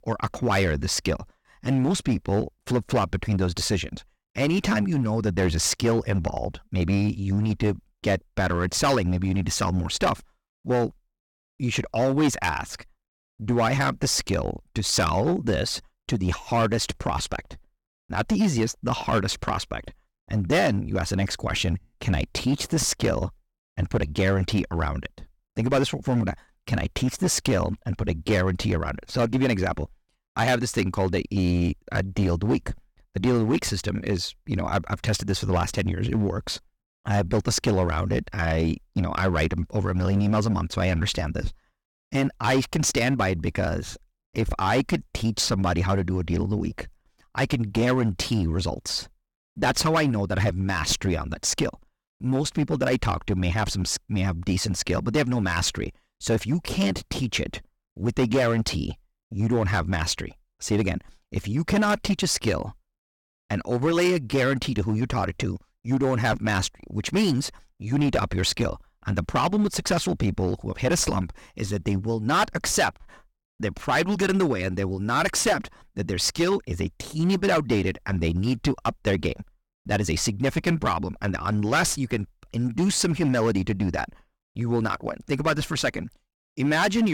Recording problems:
distortion; slight; 6% of the sound clipped
abrupt cut into speech; at the end

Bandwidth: 18 kHz